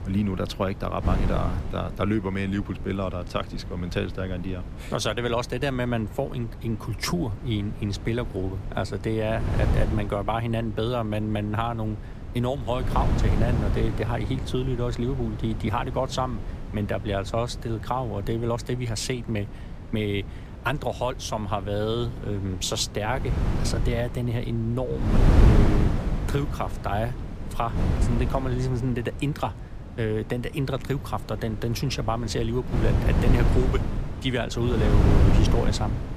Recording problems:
wind noise on the microphone; heavy; 8 dB below the speech

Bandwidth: 14.5 kHz